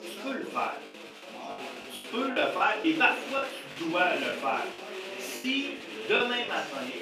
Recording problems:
off-mic speech; far
room echo; slight; dies away in 0.3 s
thin; very slightly; fading below 250 Hz
chatter from many people; noticeable; throughout; 10 dB below the speech
background music; faint; throughout; 30 dB below the speech
choppy; very; 9% of the speech affected

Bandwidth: 15 kHz